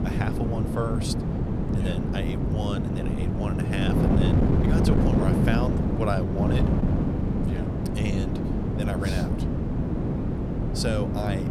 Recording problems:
wind noise on the microphone; heavy; 2 dB above the speech

